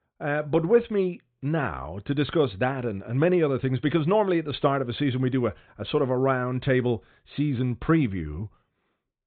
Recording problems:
high frequencies cut off; severe; nothing above 4 kHz

